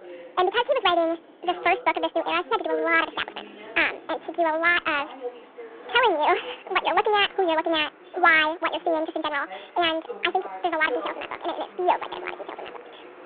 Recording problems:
wrong speed and pitch; too fast and too high; 1.7 times normal speed
phone-call audio
voice in the background; noticeable; throughout; 15 dB below the speech
traffic noise; faint; throughout; 25 dB below the speech

